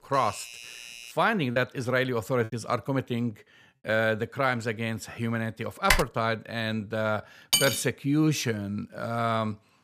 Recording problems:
doorbell; faint; until 1 s; peak 10 dB below the speech
choppy; very; from 1.5 to 2.5 s; 6% of the speech affected
keyboard typing; loud; at 6 s; peak 3 dB above the speech
clattering dishes; loud; at 7.5 s; peak 4 dB above the speech

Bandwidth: 15 kHz